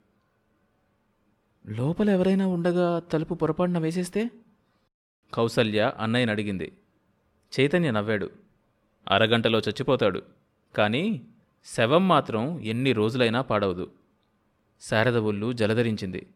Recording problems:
none

